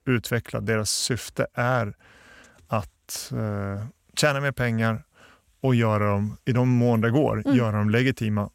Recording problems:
none

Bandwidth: 16 kHz